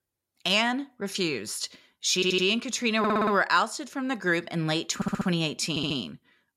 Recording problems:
audio stuttering; 4 times, first at 2 s

